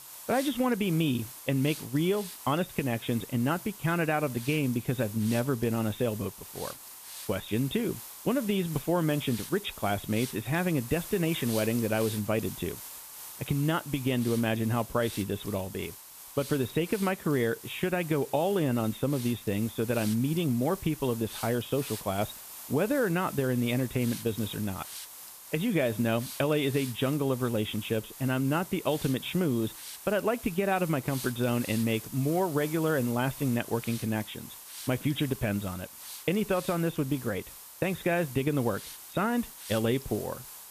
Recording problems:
high frequencies cut off; severe; nothing above 4 kHz
hiss; noticeable; throughout; 10 dB below the speech

